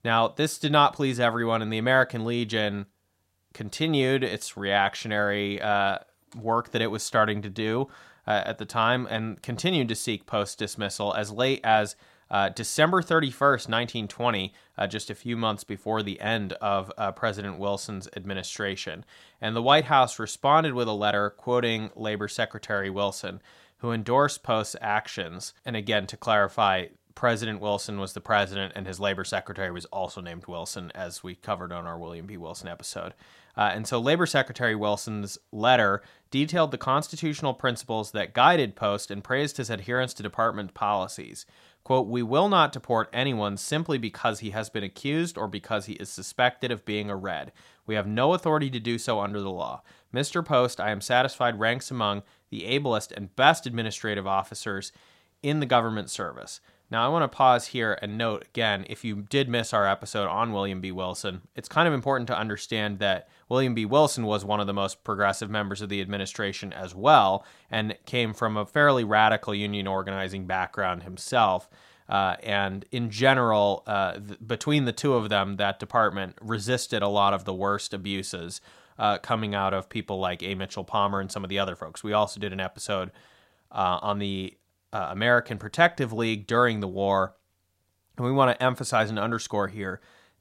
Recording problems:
none

